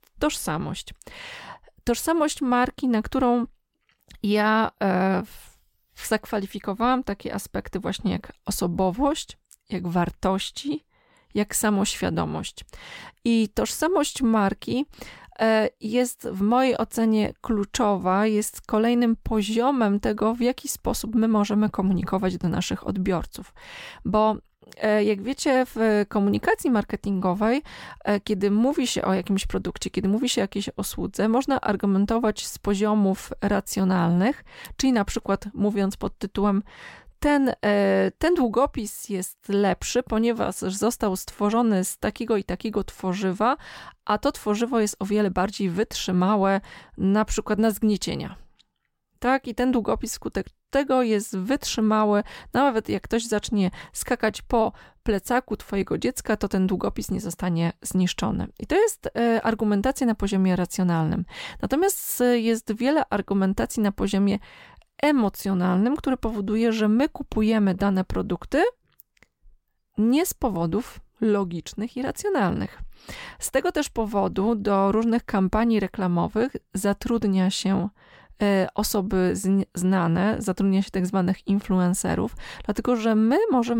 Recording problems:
abrupt cut into speech; at the end

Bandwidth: 16.5 kHz